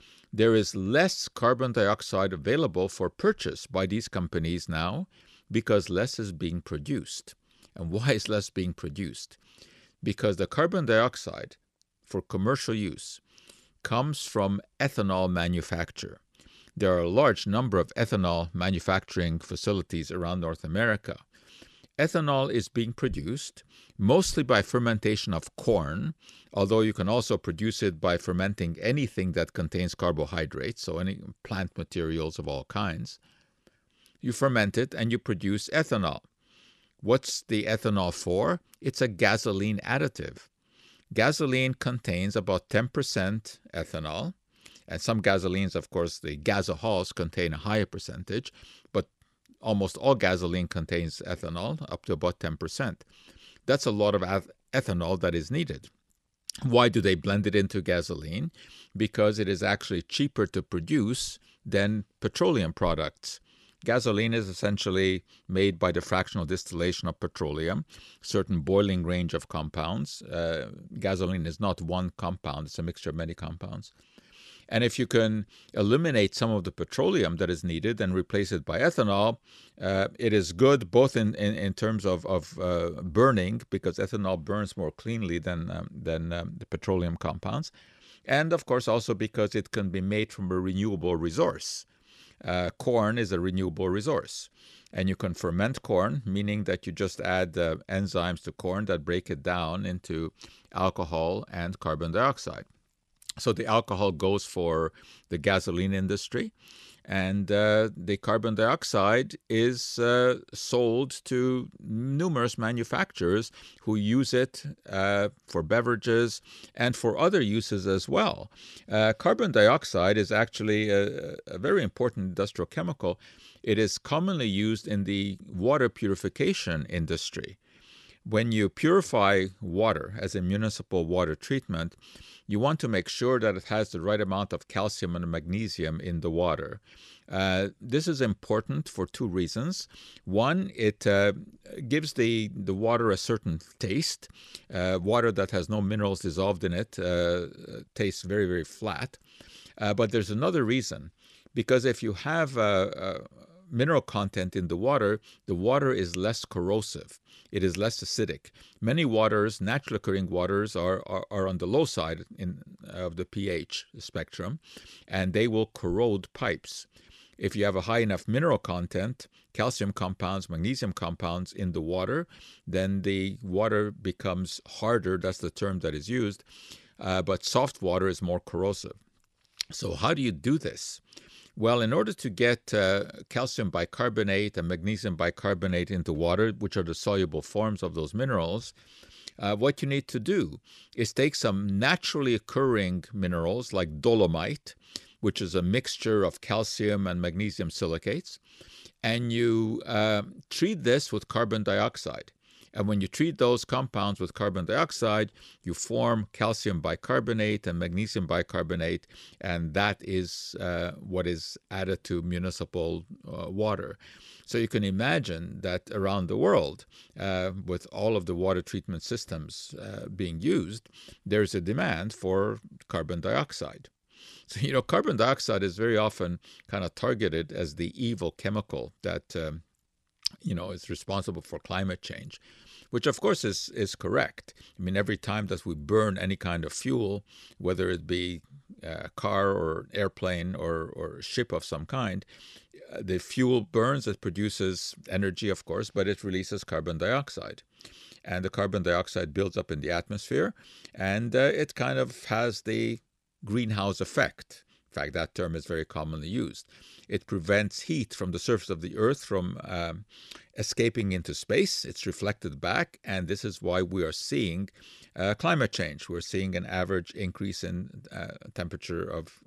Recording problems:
none

